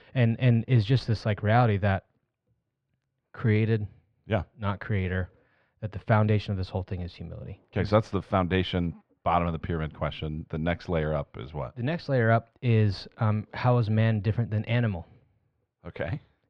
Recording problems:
muffled; very; fading above 2.5 kHz

